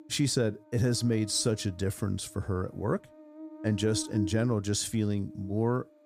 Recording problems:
electrical hum; noticeable; throughout; 50 Hz, 15 dB below the speech

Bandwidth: 15.5 kHz